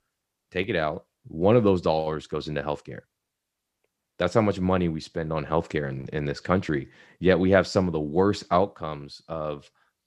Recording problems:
none

